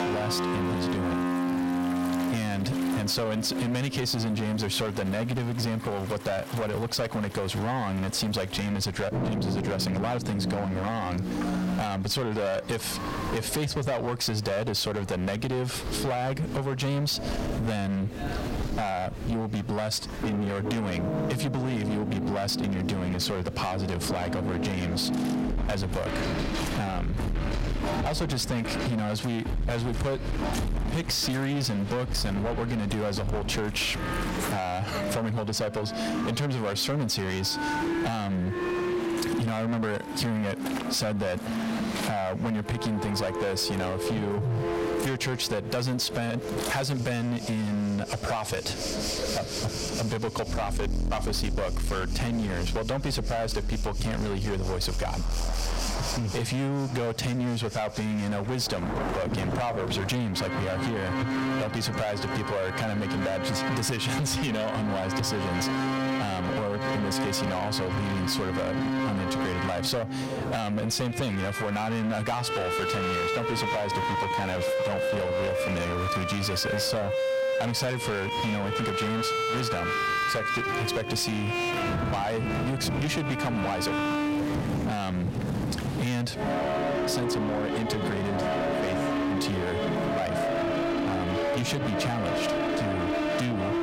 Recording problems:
distortion; heavy; 29% of the sound clipped
squashed, flat; heavily, background pumping
background music; loud; throughout; 1 dB below the speech
rain or running water; loud; throughout; 10 dB below the speech
murmuring crowd; noticeable; throughout; 15 dB below the speech

